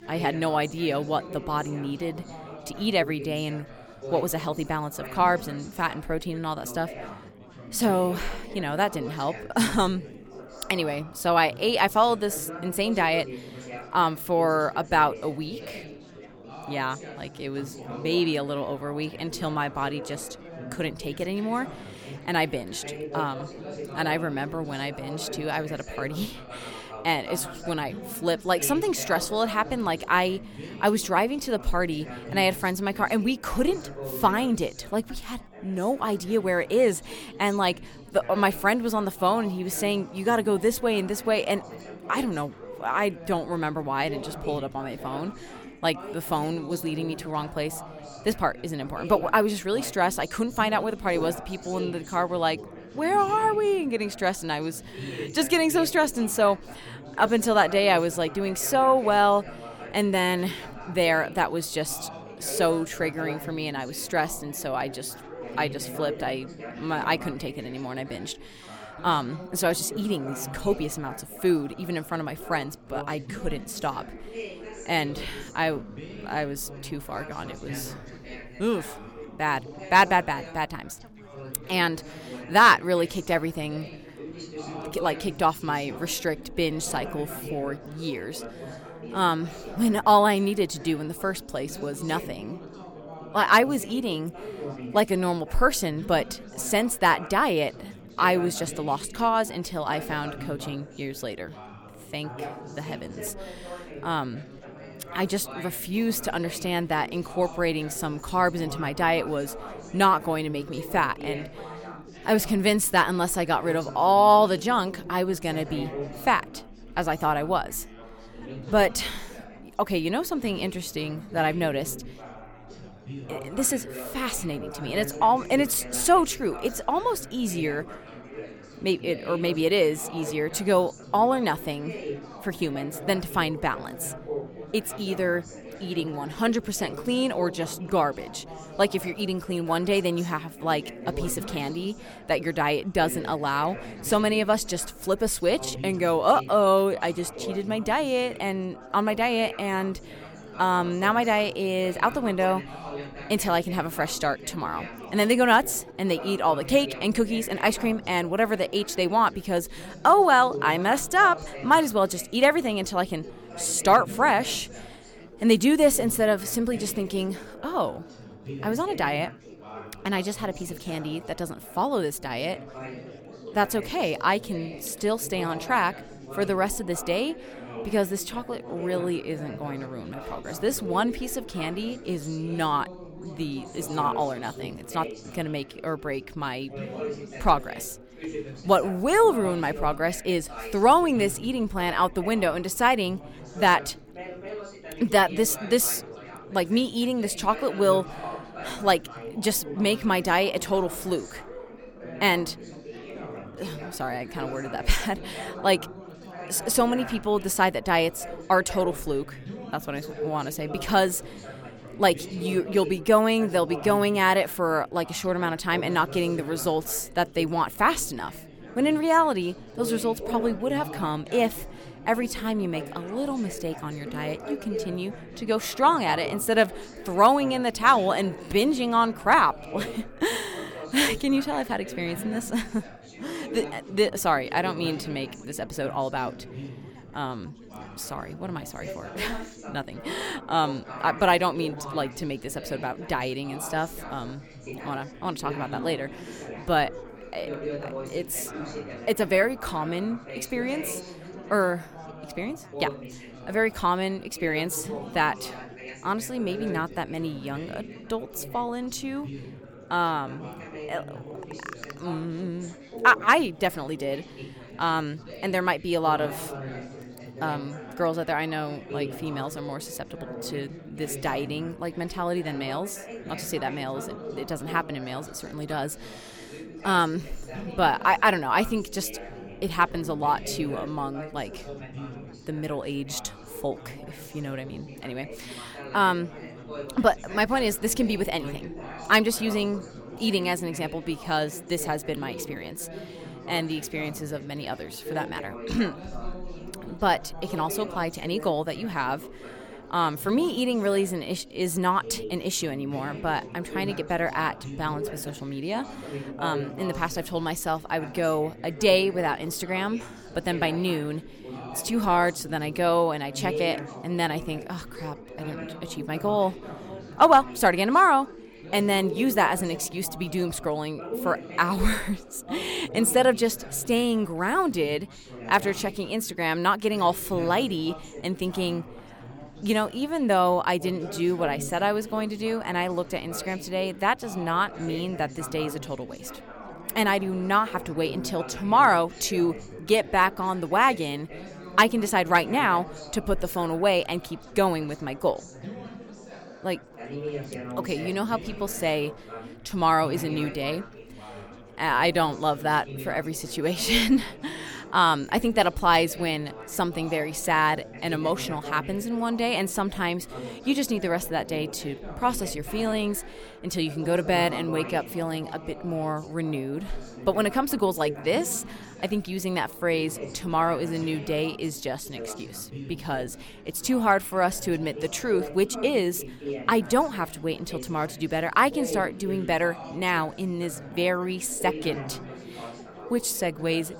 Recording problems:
chatter from many people; noticeable; throughout; 15 dB below the speech

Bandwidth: 18 kHz